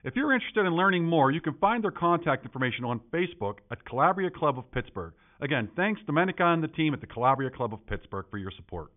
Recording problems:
high frequencies cut off; severe; nothing above 3.5 kHz

